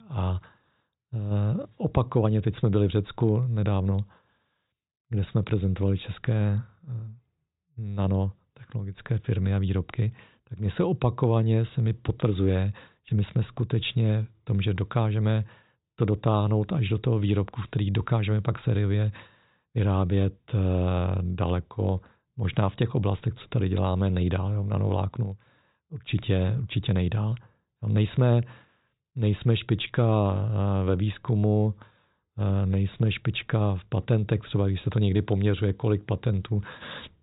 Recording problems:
high frequencies cut off; severe; nothing above 4 kHz

